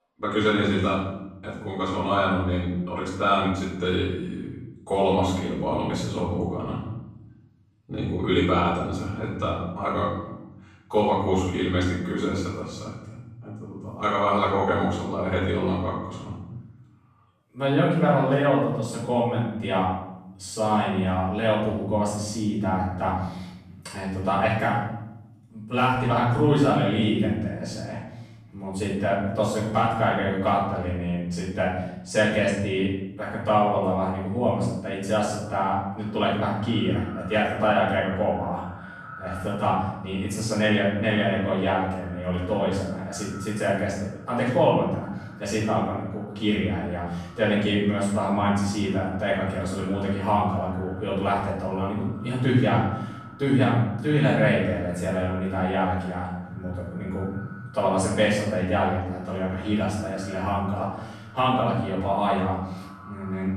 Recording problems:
room echo; strong; dies away in 0.9 s
off-mic speech; far
echo of what is said; faint; from 35 s on; 450 ms later, 20 dB below the speech

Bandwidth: 14.5 kHz